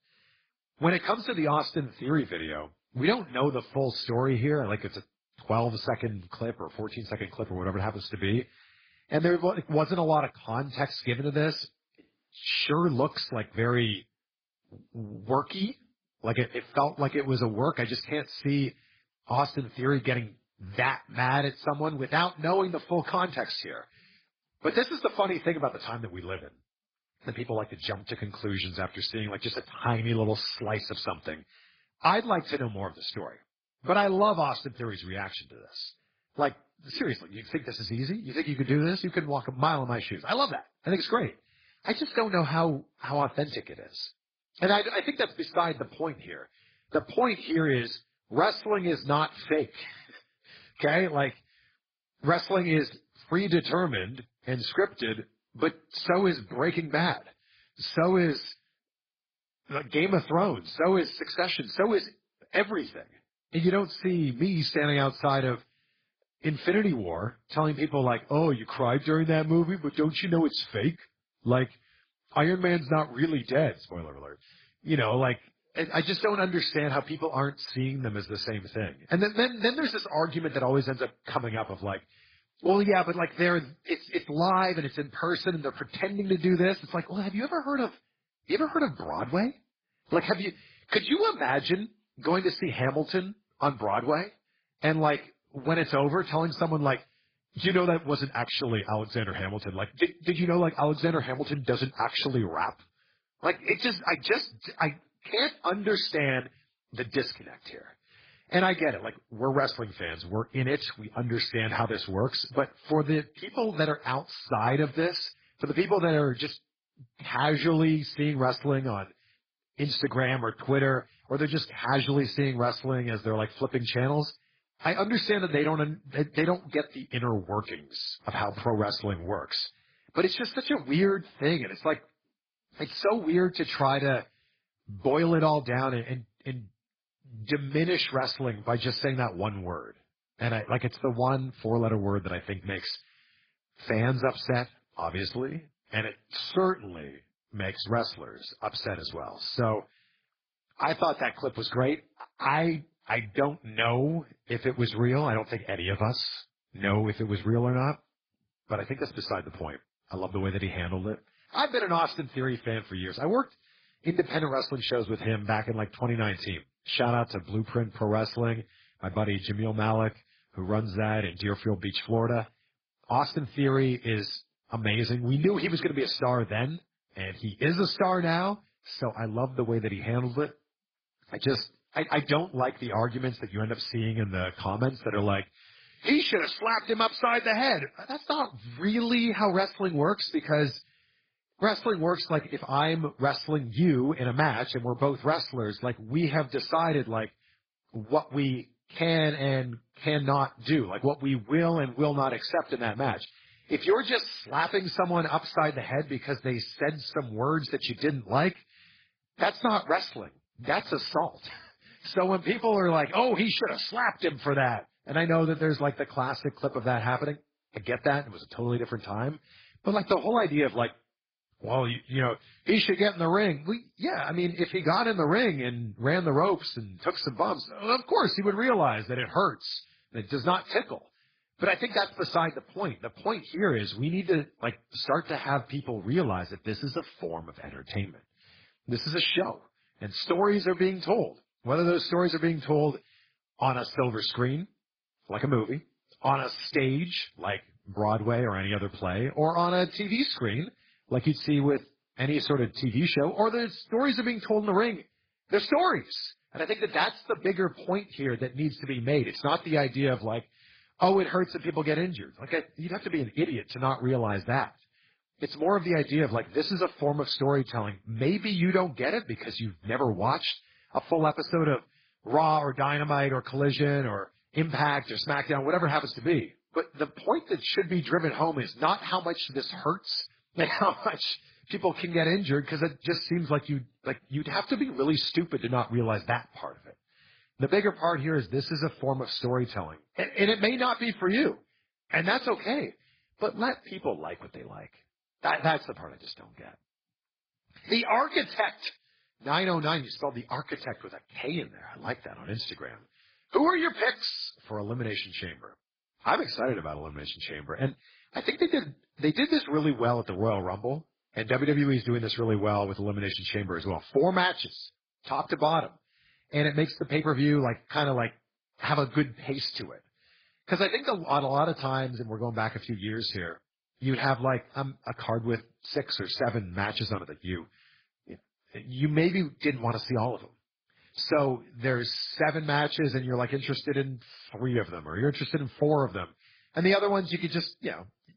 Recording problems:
garbled, watery; badly

